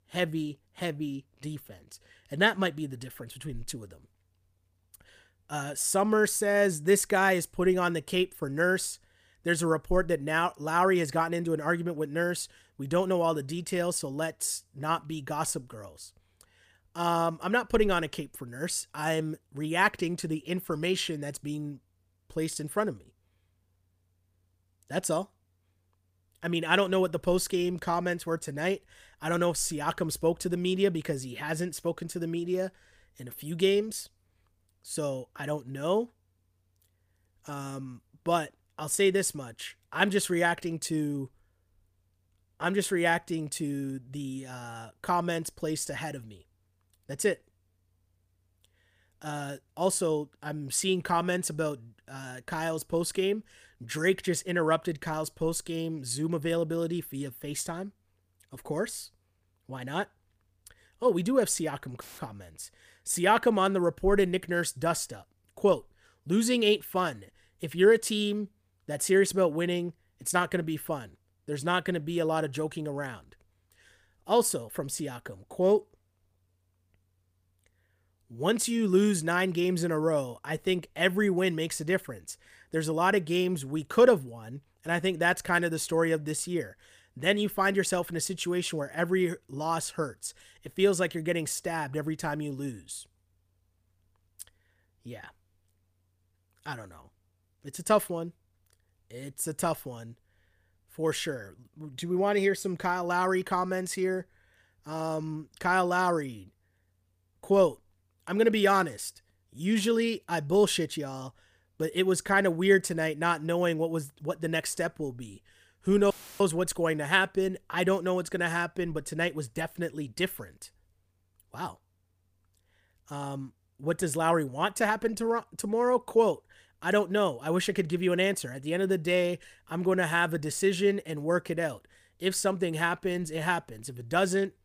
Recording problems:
audio cutting out; filled with static; at 1:02 and at 1:56

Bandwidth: 15 kHz